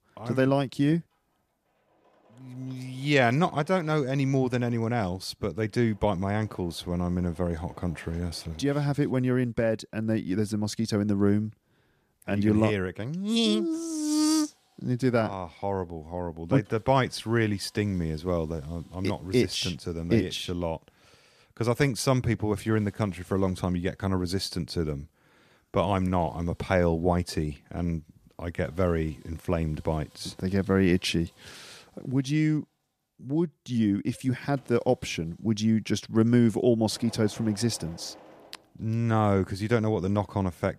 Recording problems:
machinery noise; faint; throughout; 30 dB below the speech

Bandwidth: 14.5 kHz